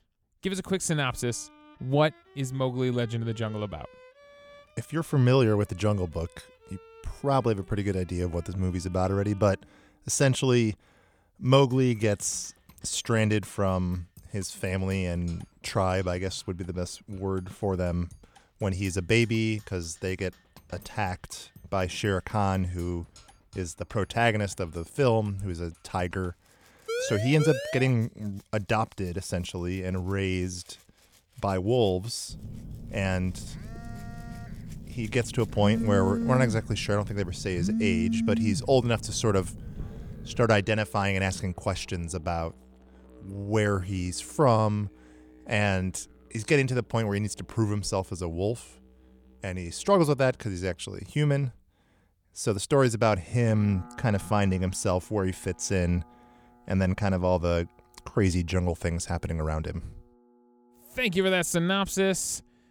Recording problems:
background music; faint; throughout; 30 dB below the speech
siren; noticeable; from 27 to 28 s; peak 4 dB below the speech
phone ringing; loud; from 32 to 40 s; peak 1 dB above the speech

